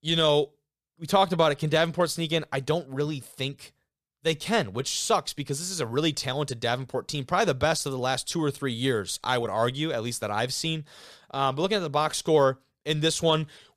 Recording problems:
none

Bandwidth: 14.5 kHz